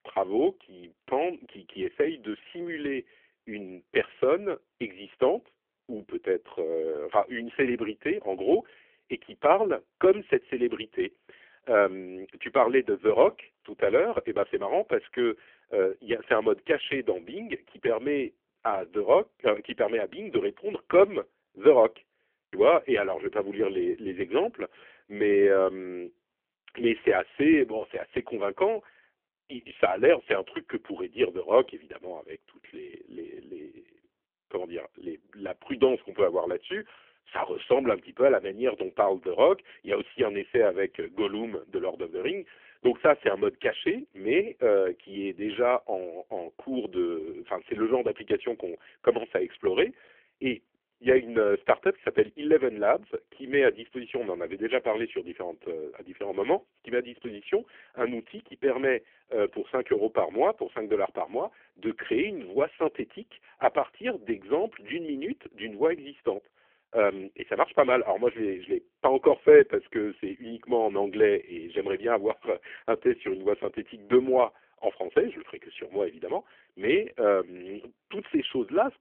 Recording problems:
phone-call audio; poor line; nothing above 3.5 kHz

